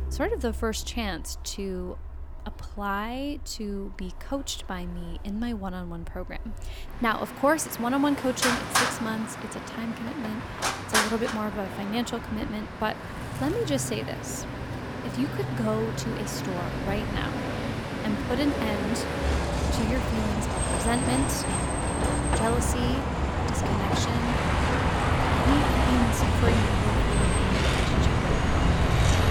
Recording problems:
traffic noise; very loud; throughout; 4 dB above the speech

